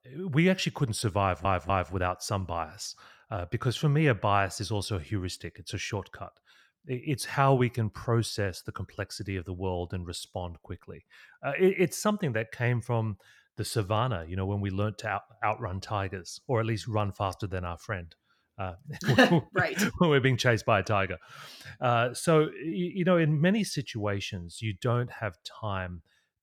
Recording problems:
audio stuttering; at 1 s

